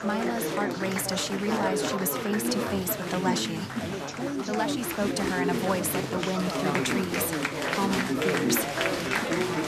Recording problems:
chatter from many people; very loud; throughout; 1 dB above the speech

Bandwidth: 14 kHz